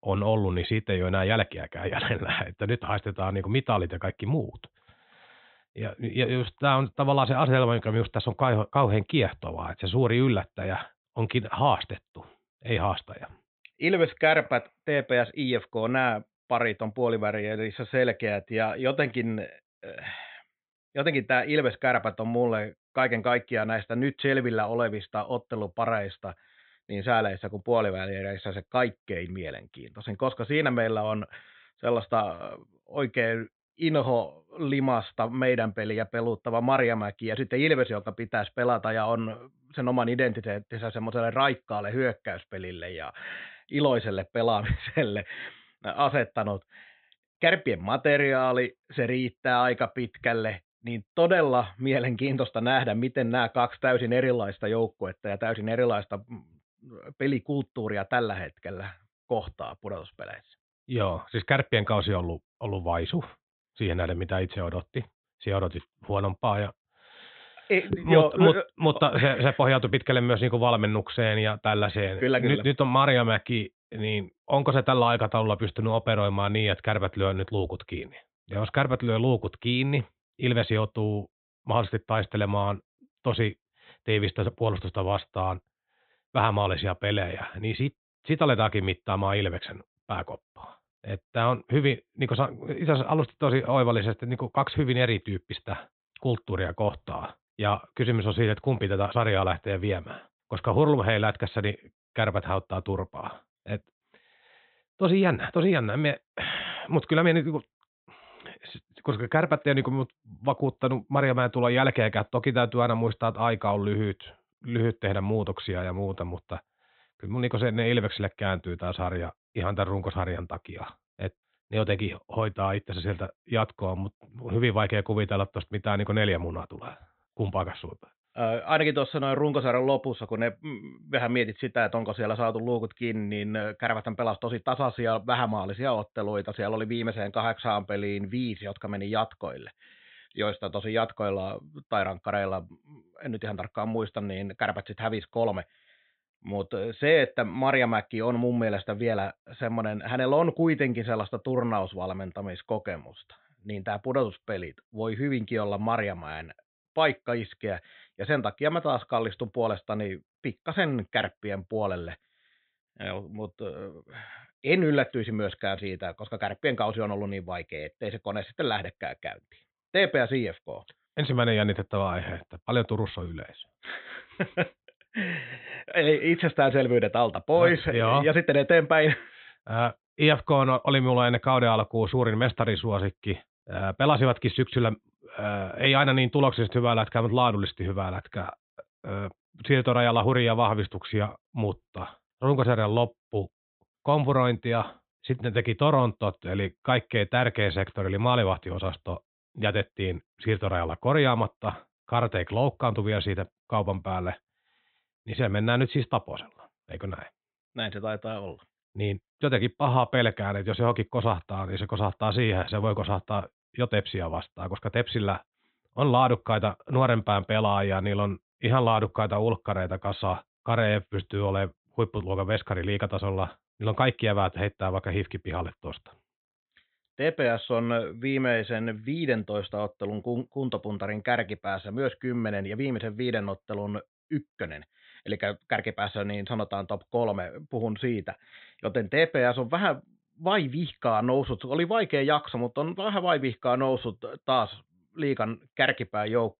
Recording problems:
high frequencies cut off; severe; nothing above 4 kHz

